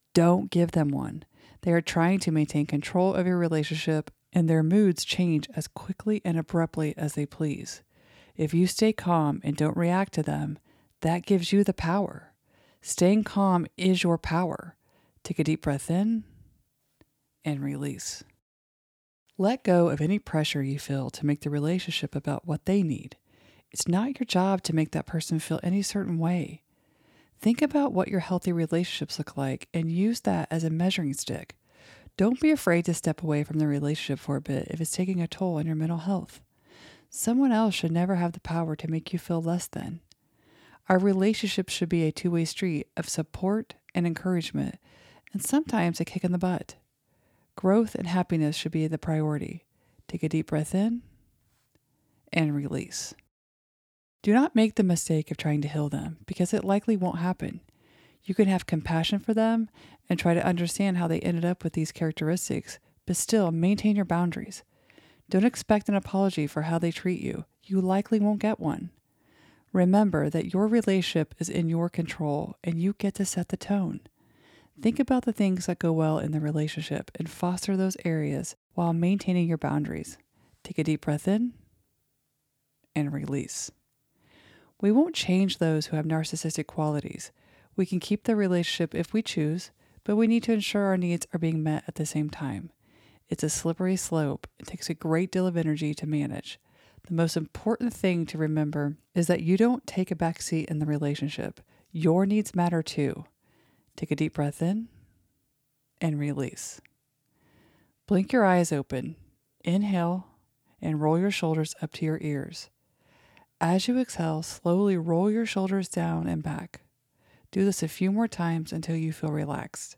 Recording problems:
none

